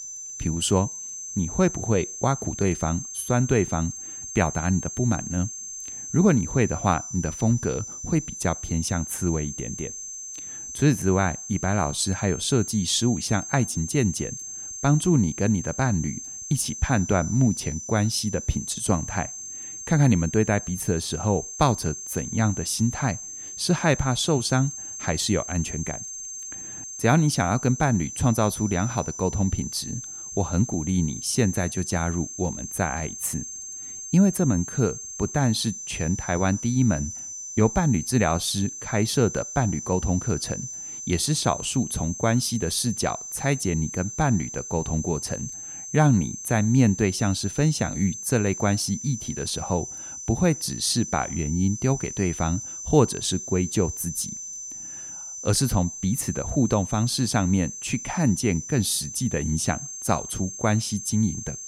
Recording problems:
high-pitched whine; loud; throughout; 6.5 kHz, 9 dB below the speech

